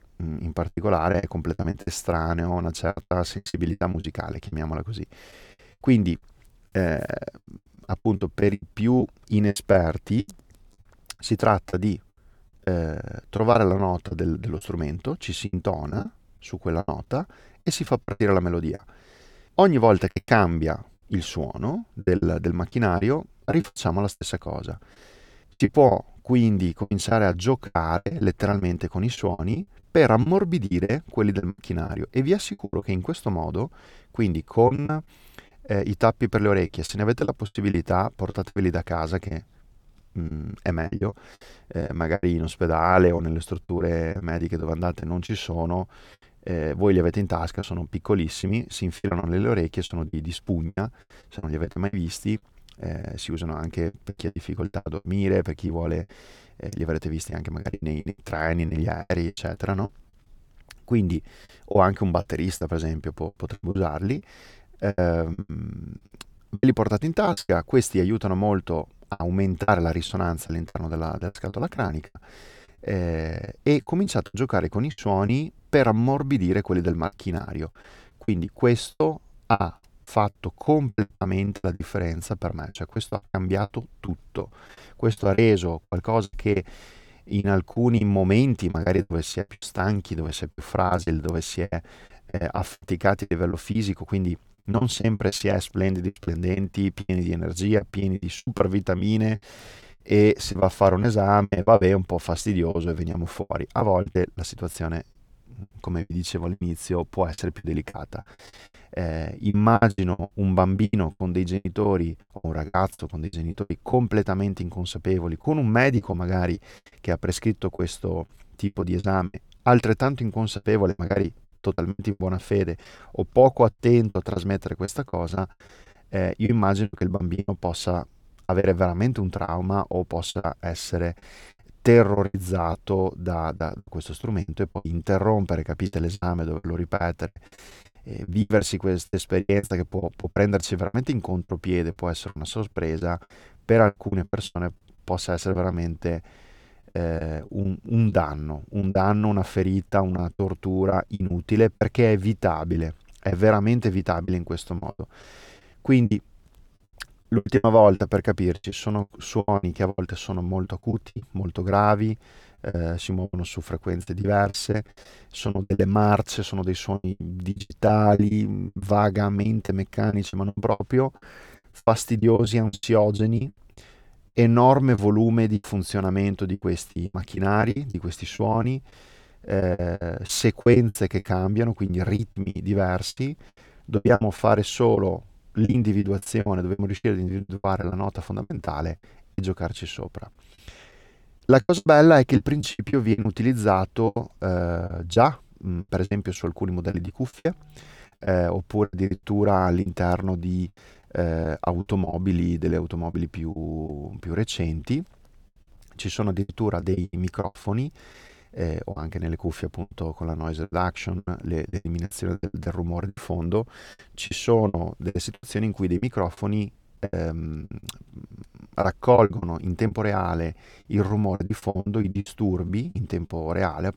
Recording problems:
choppy; very; 13% of the speech affected

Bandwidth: 18.5 kHz